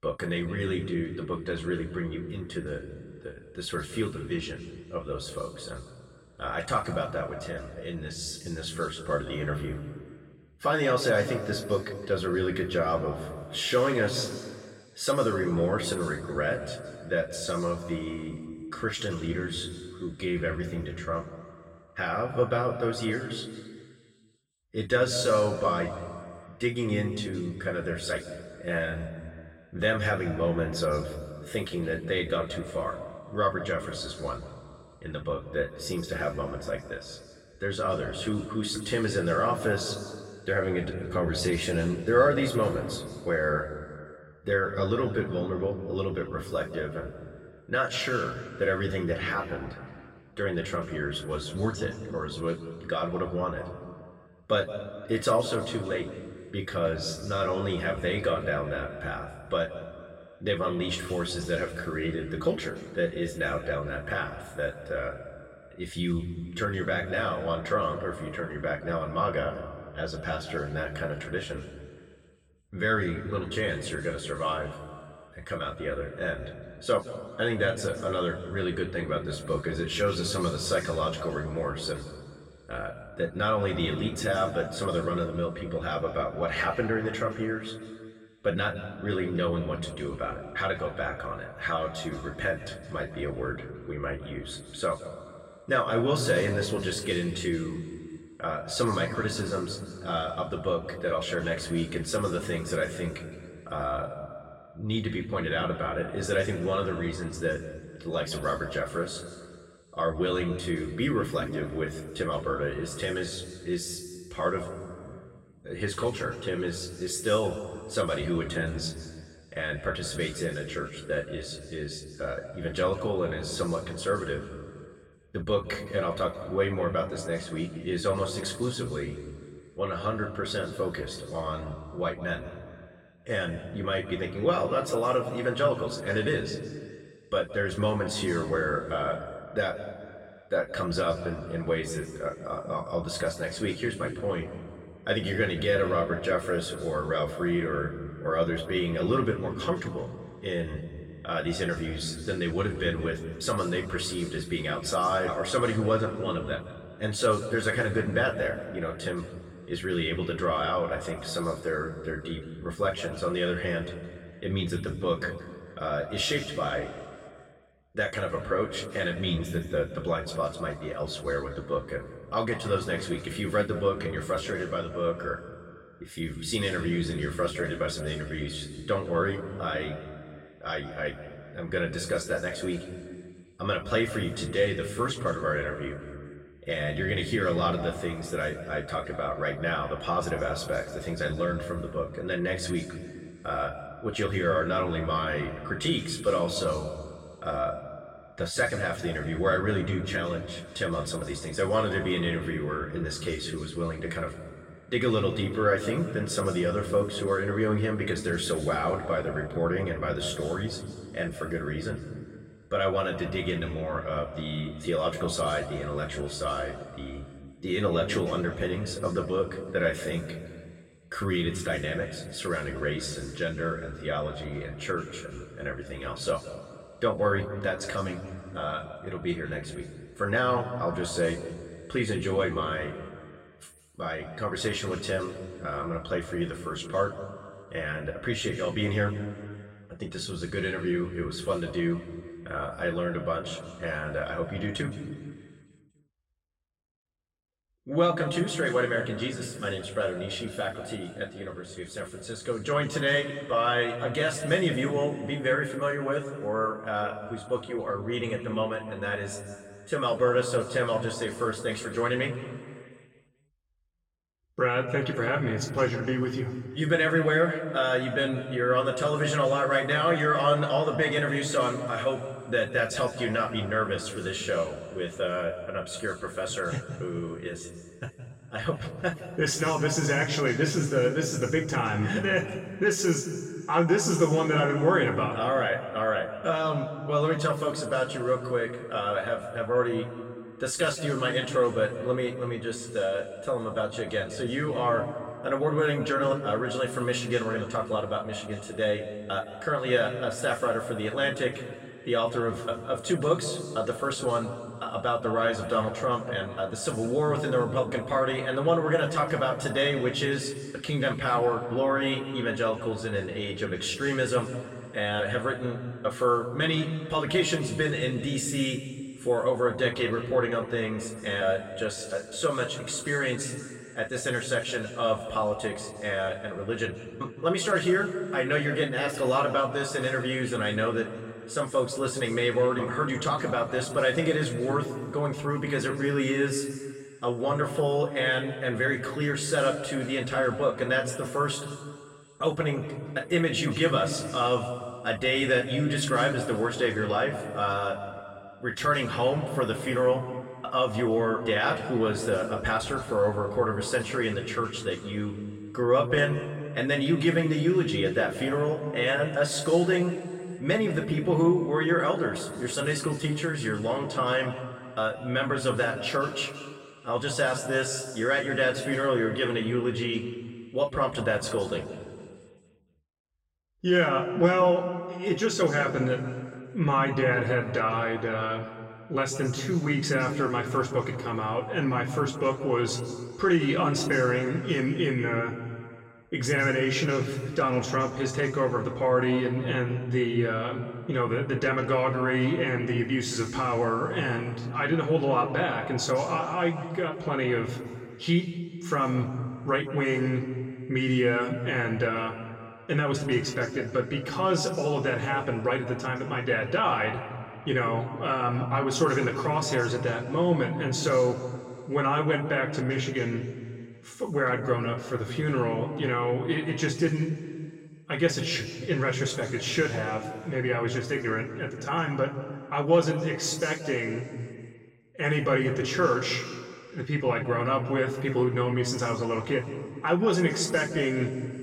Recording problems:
off-mic speech; far
room echo; noticeable; dies away in 1.8 s

